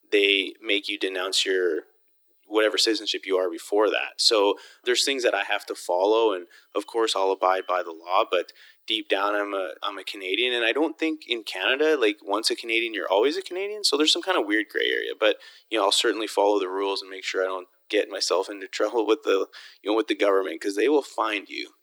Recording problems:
thin; very; fading below 300 Hz

